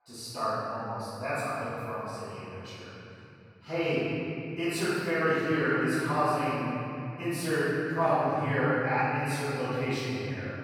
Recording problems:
room echo; strong; dies away in 3 s
off-mic speech; far

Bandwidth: 17.5 kHz